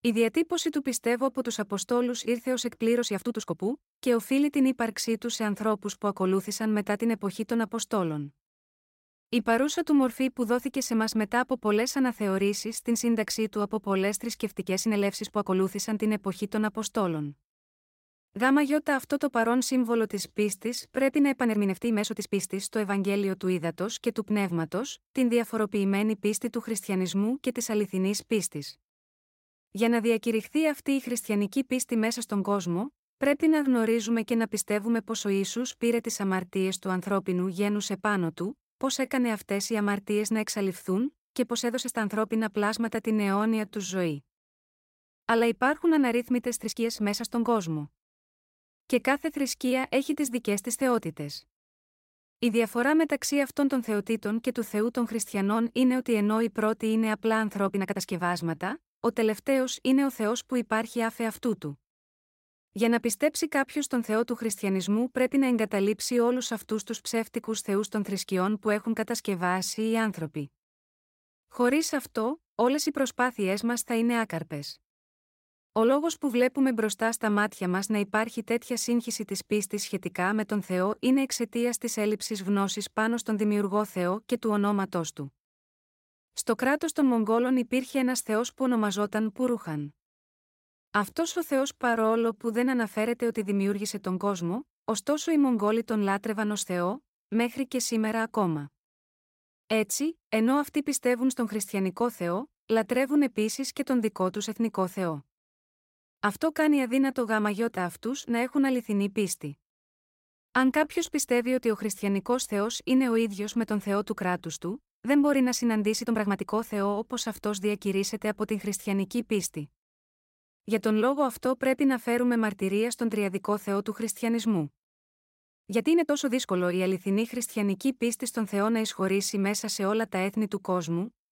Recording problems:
uneven, jittery; strongly; from 3 s to 2:07

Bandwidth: 16 kHz